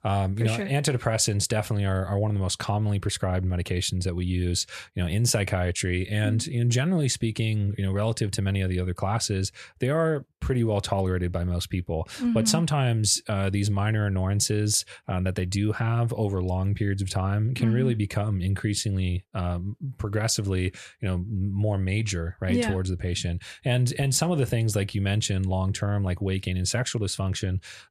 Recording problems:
none

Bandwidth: 14 kHz